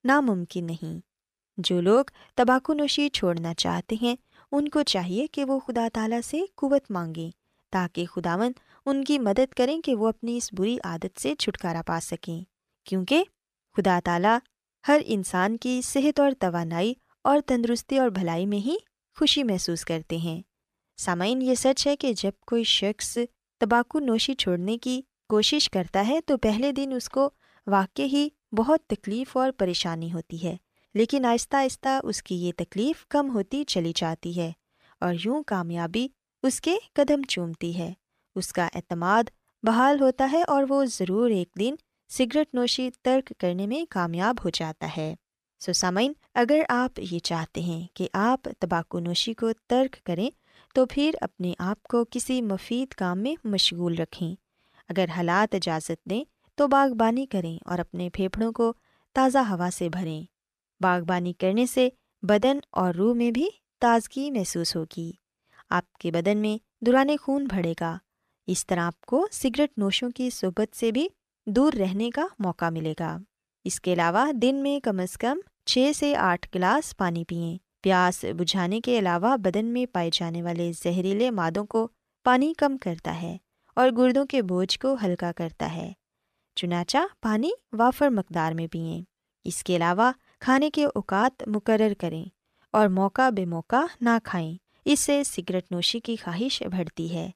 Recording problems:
none

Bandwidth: 14.5 kHz